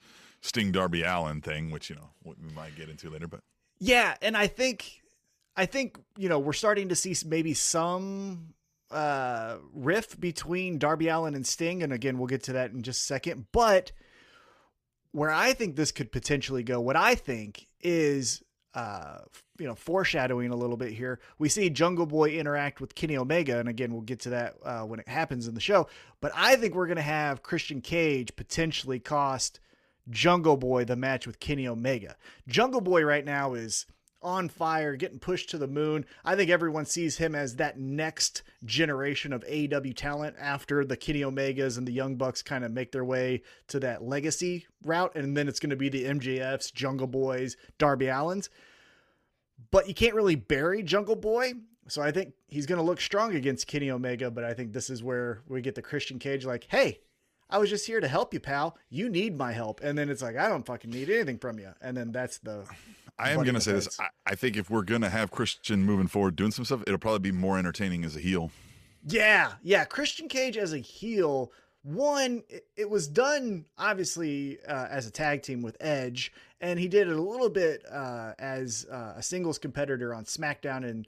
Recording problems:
none

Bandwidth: 14.5 kHz